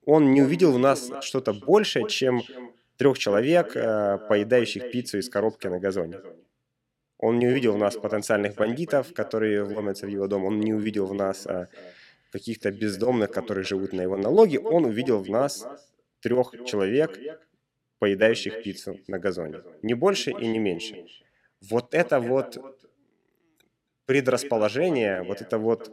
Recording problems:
echo of what is said; noticeable; throughout; 270 ms later, 15 dB below the speech

